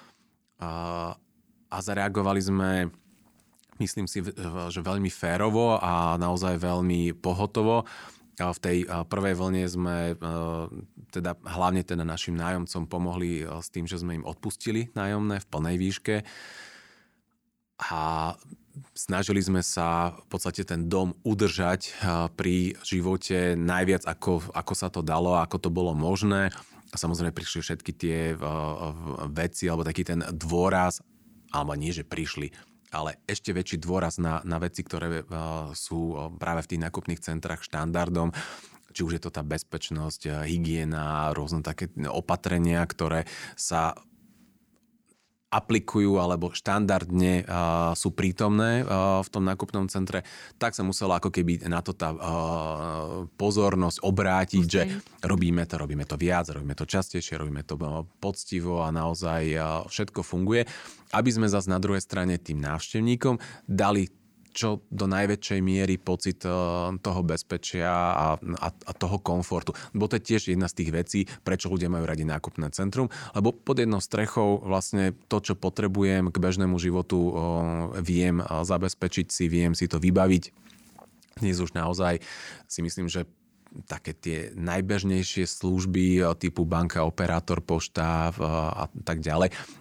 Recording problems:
none

